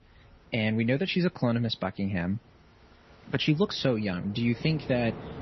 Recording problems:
garbled, watery; slightly; nothing above 6 kHz
wind in the background; noticeable; throughout; 20 dB below the speech

